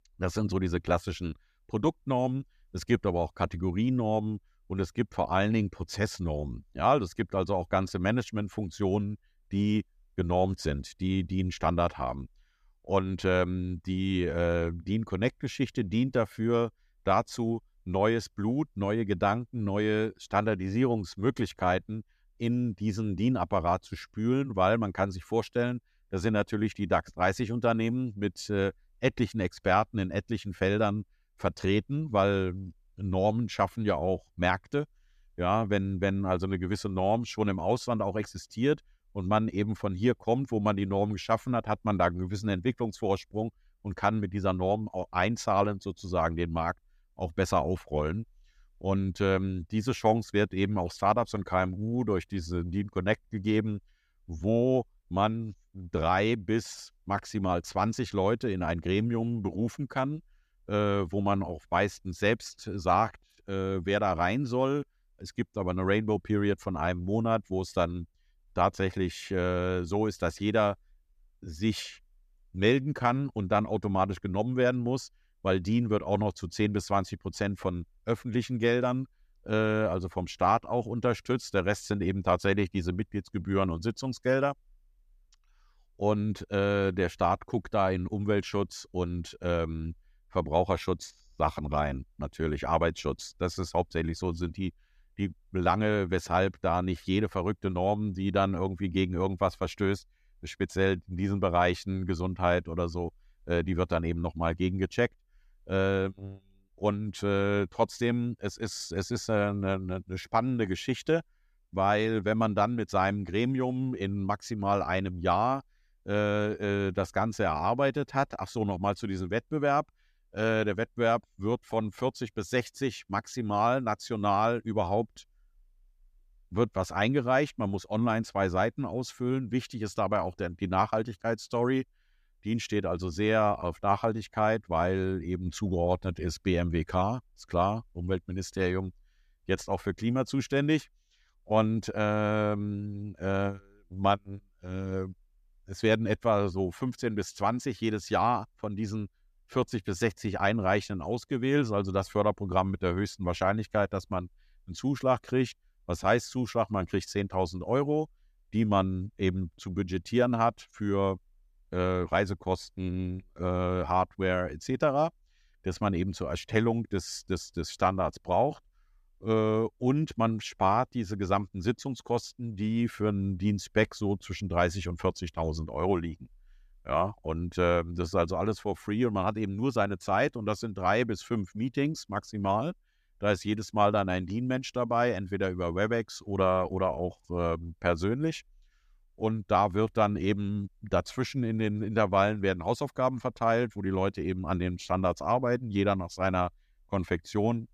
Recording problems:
none

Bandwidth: 14.5 kHz